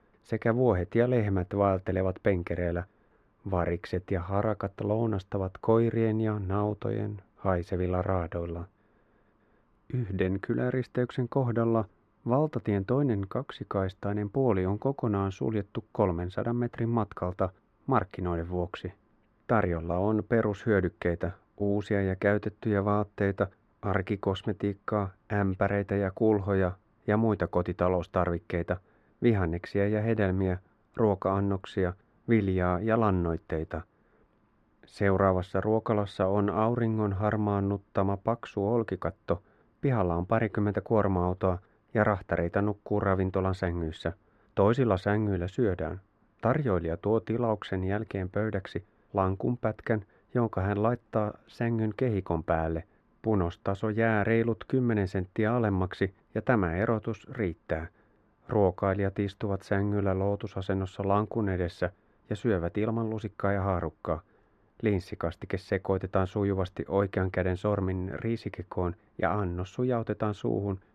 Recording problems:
muffled; very; fading above 3.5 kHz

